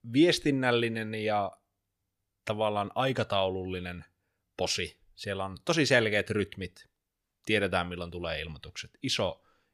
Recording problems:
none

